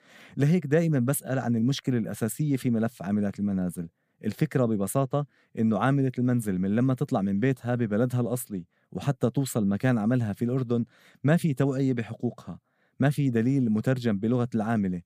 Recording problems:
none

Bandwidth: 15 kHz